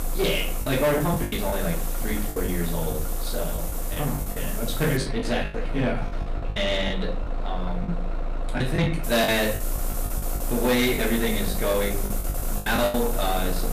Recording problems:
off-mic speech; far
room echo; slight; dies away in 0.3 s
distortion; slight; 10 dB below the speech
traffic noise; loud; throughout; 7 dB below the speech
hiss; loud; until 5 s and from 9 s on; 9 dB below the speech
choppy; very; 10% of the speech affected

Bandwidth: 14.5 kHz